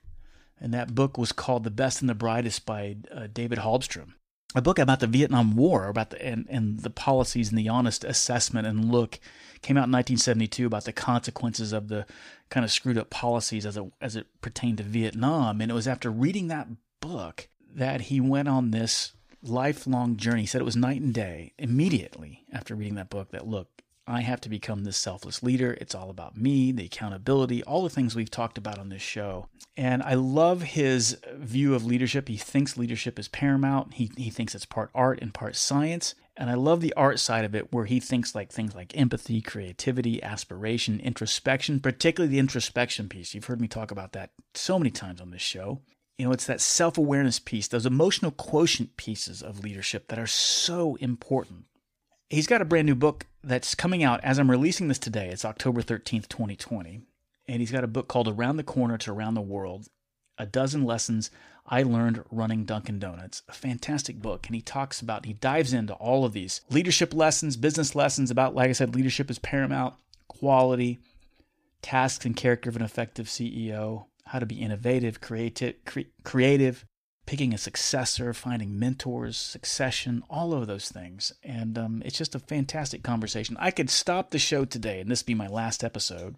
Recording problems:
none

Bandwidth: 15 kHz